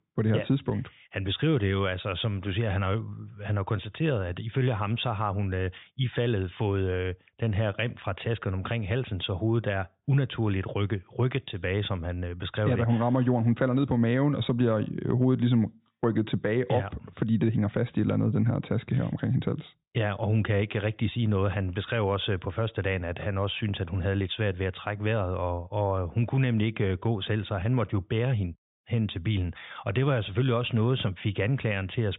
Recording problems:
high frequencies cut off; severe; nothing above 4 kHz

